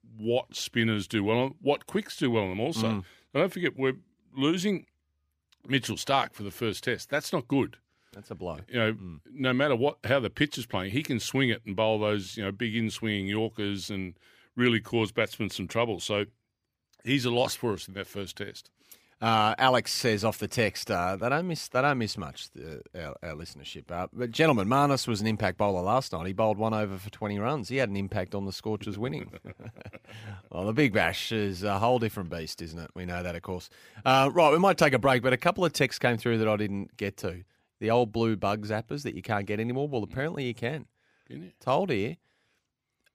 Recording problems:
none

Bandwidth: 15 kHz